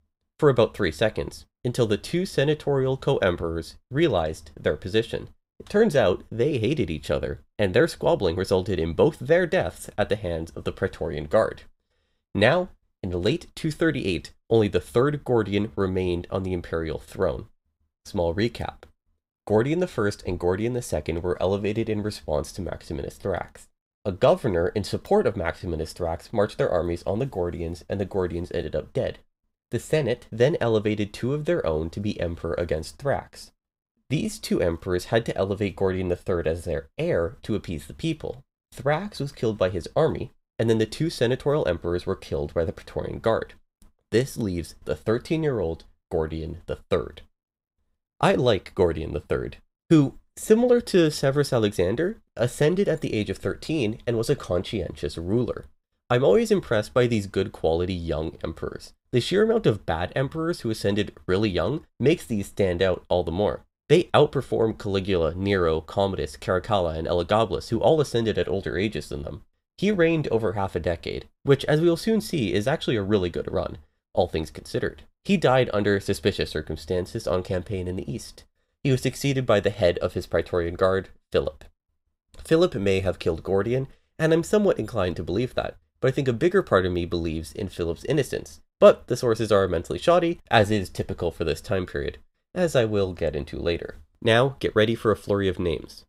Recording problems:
none

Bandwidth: 15.5 kHz